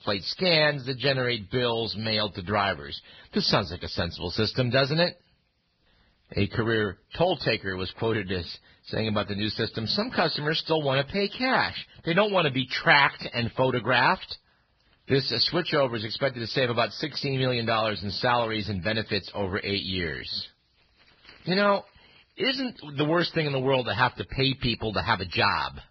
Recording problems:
garbled, watery; badly

